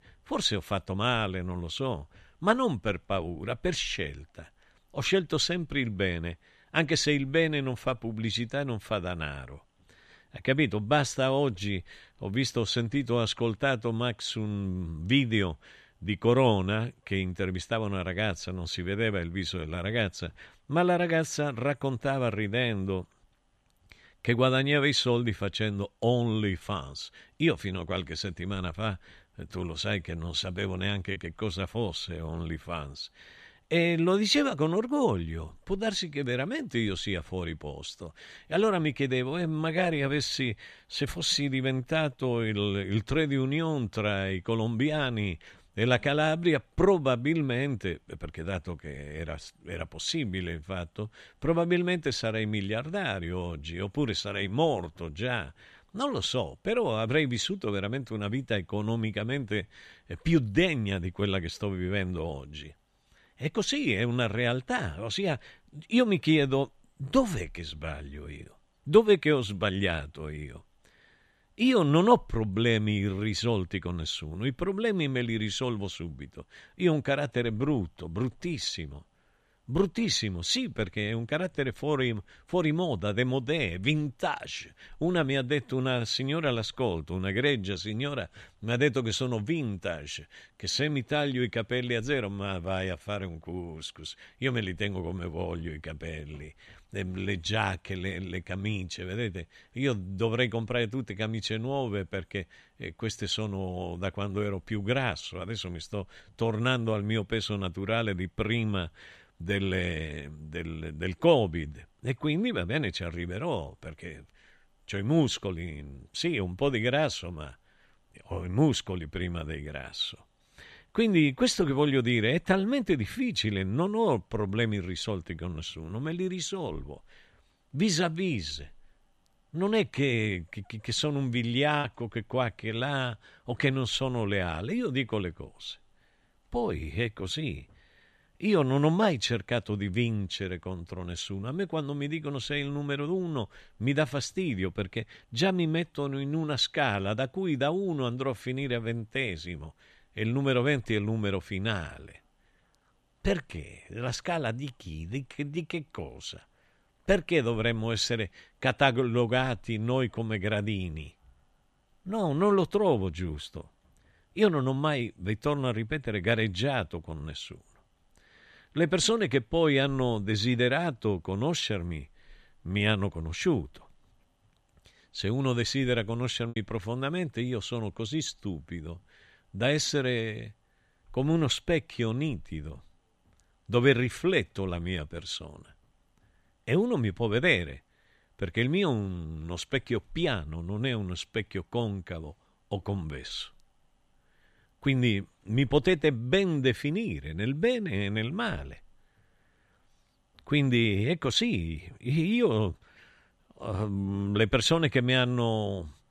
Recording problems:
choppy; occasionally; at 31 s, at 2:12 and at 2:56; 3% of the speech affected

